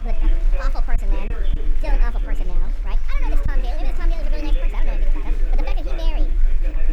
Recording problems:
wrong speed and pitch; too fast and too high; 1.5 times normal speed
chatter from many people; loud; throughout; 2 dB below the speech
low rumble; noticeable; throughout; 15 dB below the speech
choppy; occasionally; at 1 s and at 3.5 s; 3% of the speech affected

